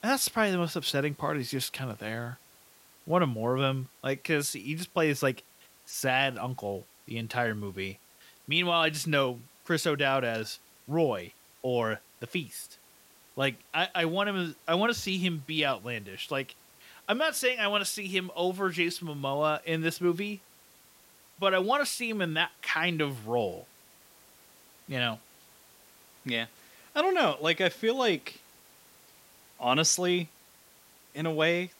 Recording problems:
hiss; faint; throughout; 25 dB below the speech

